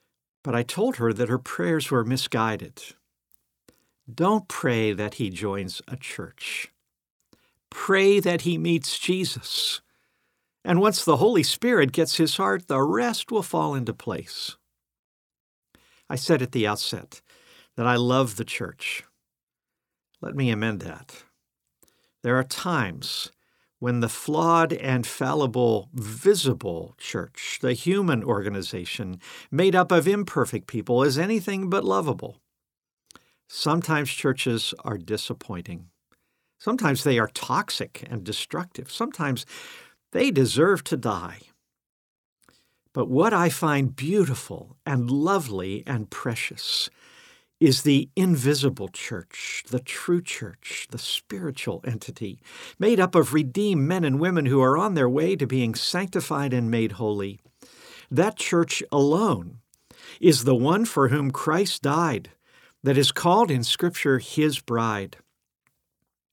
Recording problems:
none

